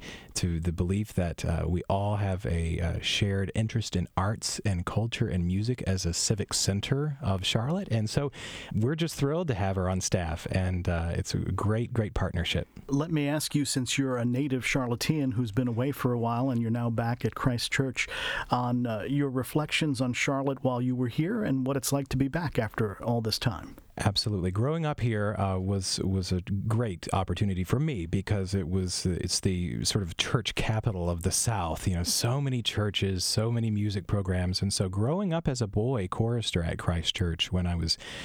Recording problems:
squashed, flat; somewhat

